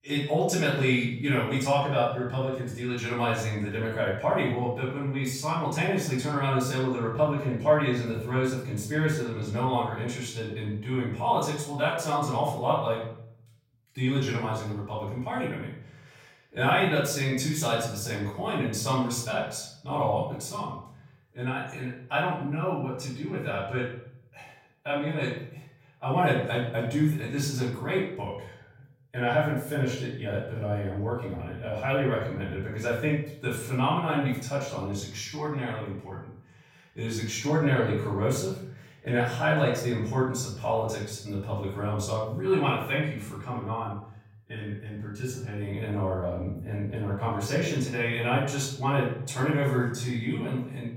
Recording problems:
off-mic speech; far
room echo; noticeable; dies away in 0.6 s

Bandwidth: 16.5 kHz